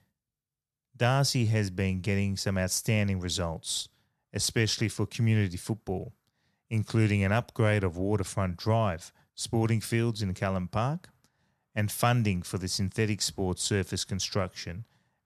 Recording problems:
none

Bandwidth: 13.5 kHz